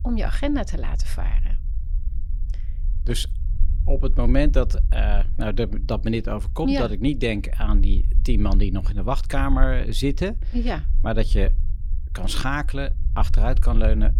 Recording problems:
low rumble; noticeable; throughout; 20 dB below the speech

